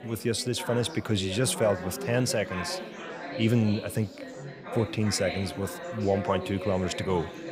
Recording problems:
chatter from many people; loud; throughout; 9 dB below the speech

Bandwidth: 15.5 kHz